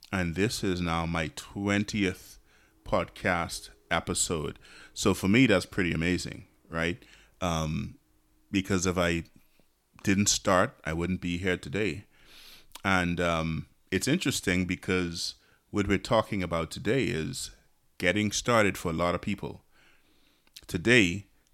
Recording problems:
none

